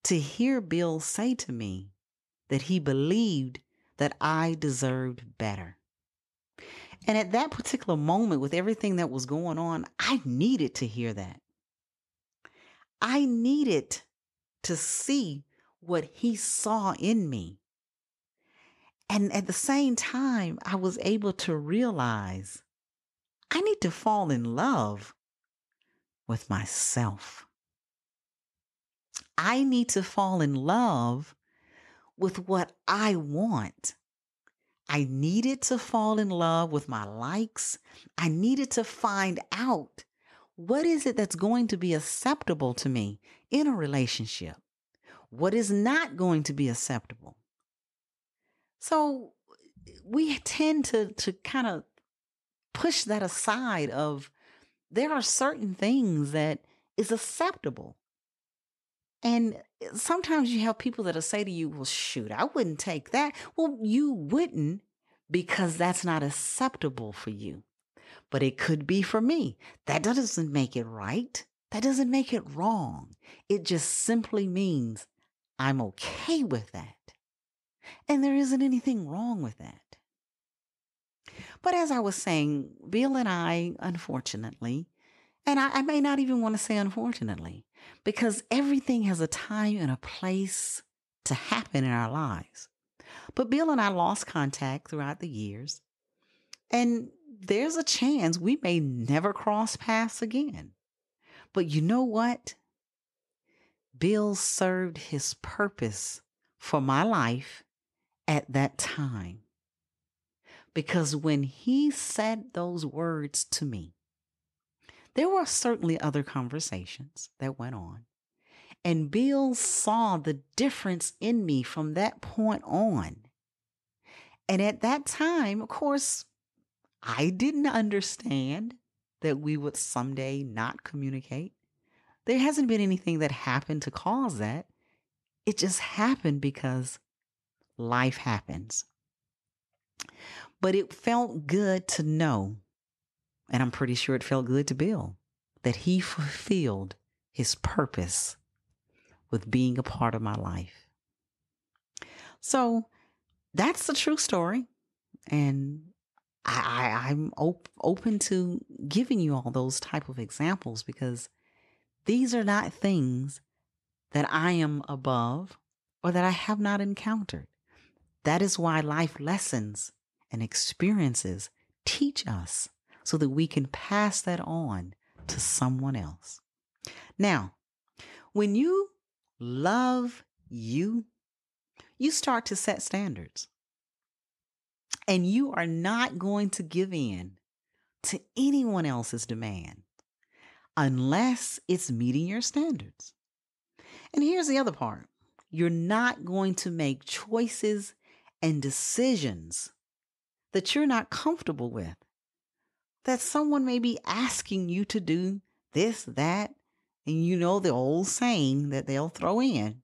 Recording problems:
none

